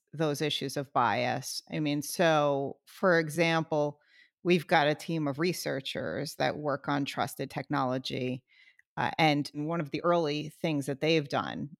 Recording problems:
uneven, jittery; strongly; from 1.5 to 11 s

